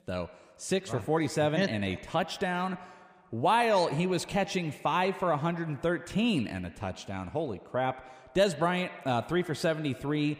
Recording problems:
echo of what is said; noticeable; throughout; 80 ms later, 15 dB below the speech

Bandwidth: 15 kHz